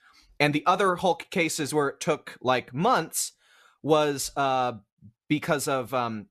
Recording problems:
none

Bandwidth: 13.5 kHz